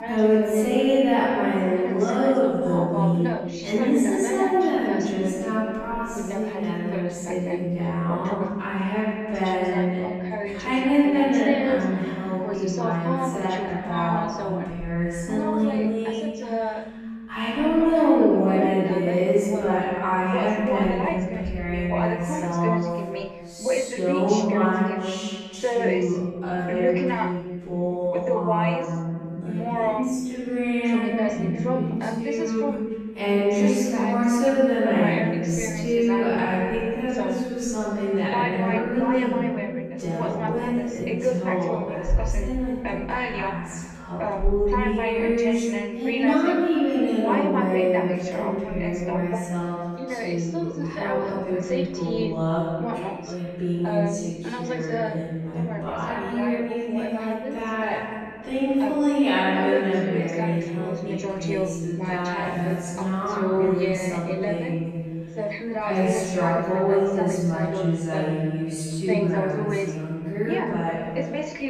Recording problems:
room echo; strong; dies away in 2.1 s
off-mic speech; far
wrong speed, natural pitch; too slow; 0.6 times normal speed
voice in the background; loud; throughout; 6 dB below the speech

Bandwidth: 14 kHz